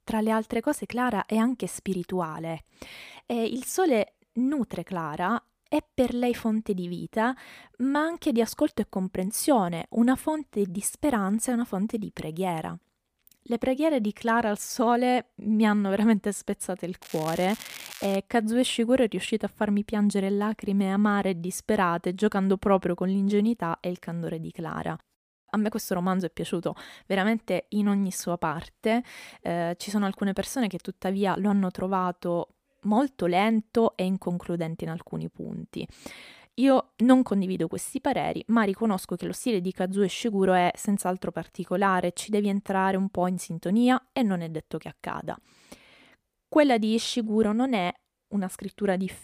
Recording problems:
crackling; noticeable; from 17 to 18 s; 15 dB below the speech

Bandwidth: 15 kHz